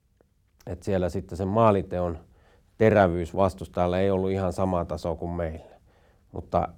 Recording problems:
none

